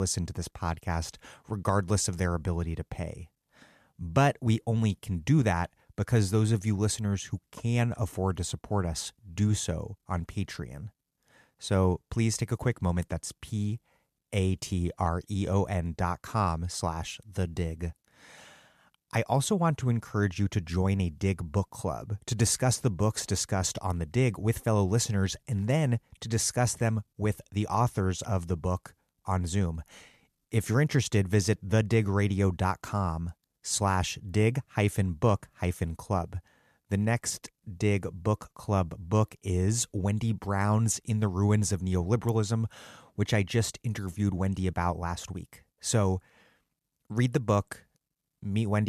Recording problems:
abrupt cut into speech; at the start and the end

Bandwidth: 14 kHz